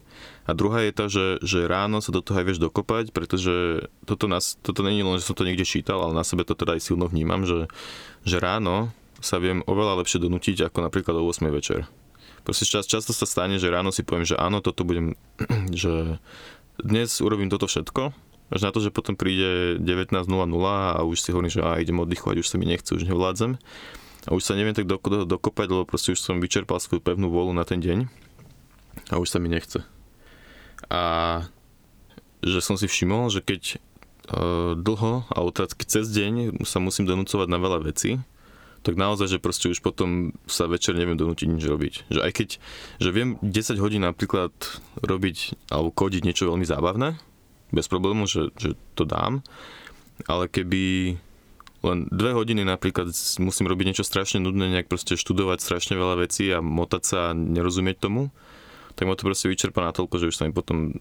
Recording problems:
squashed, flat; somewhat

